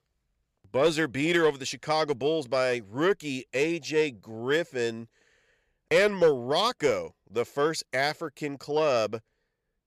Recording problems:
none

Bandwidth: 14.5 kHz